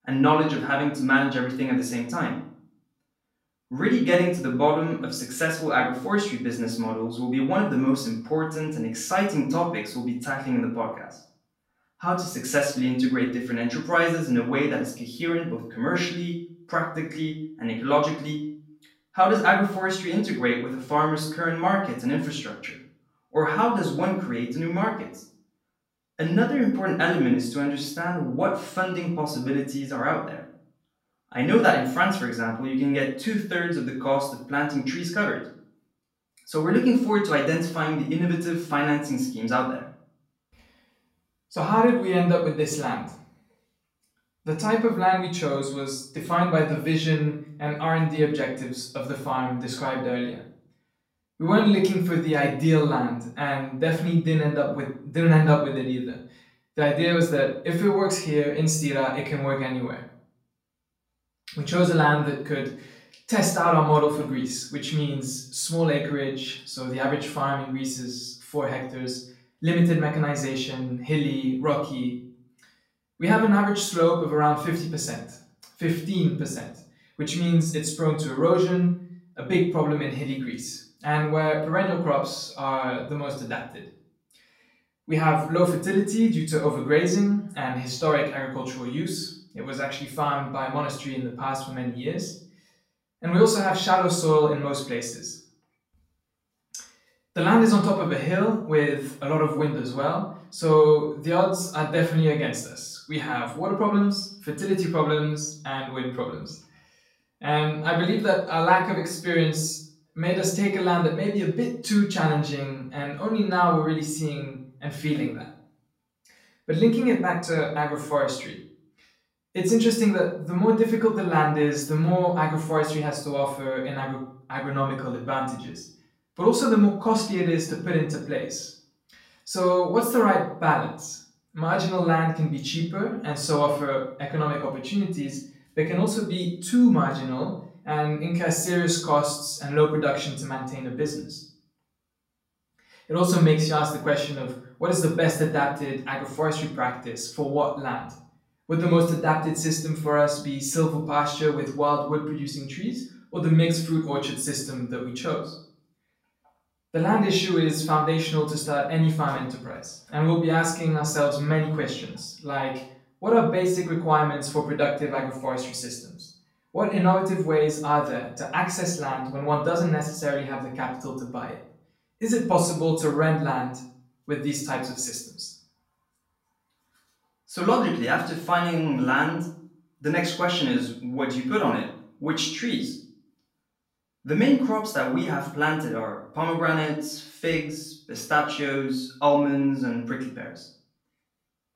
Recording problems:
off-mic speech; far
room echo; slight; dies away in 0.5 s

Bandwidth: 16 kHz